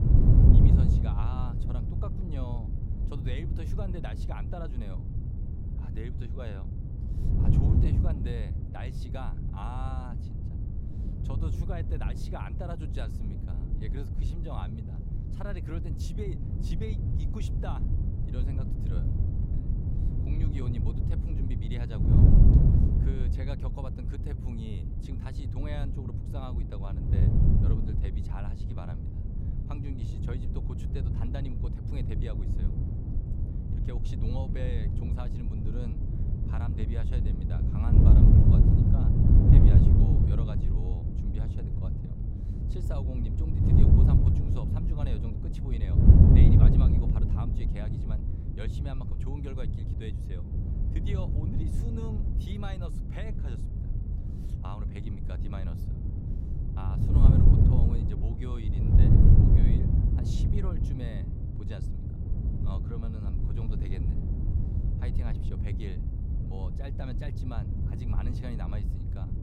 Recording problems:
wind noise on the microphone; heavy; 5 dB above the speech

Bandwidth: 16 kHz